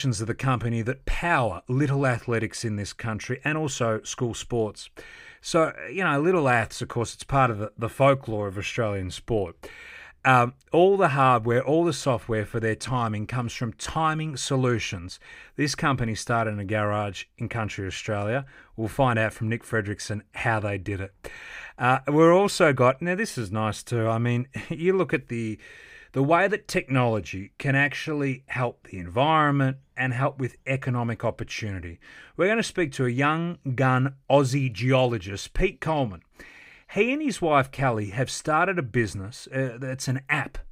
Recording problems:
abrupt cut into speech; at the start

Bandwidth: 15.5 kHz